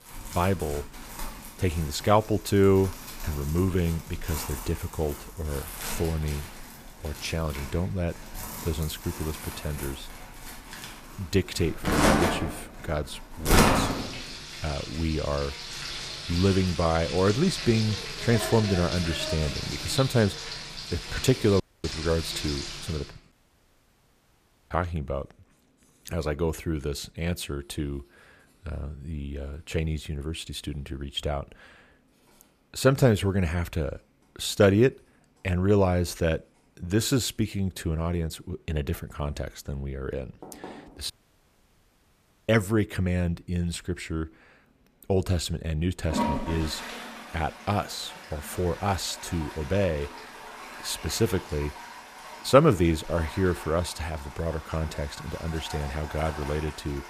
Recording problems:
household noises; loud; throughout; 6 dB below the speech
audio cutting out; at 22 s, at 23 s for 1.5 s and at 41 s for 1.5 s

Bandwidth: 14.5 kHz